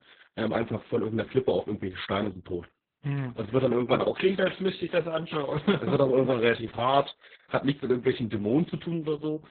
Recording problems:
garbled, watery; badly; nothing above 4 kHz

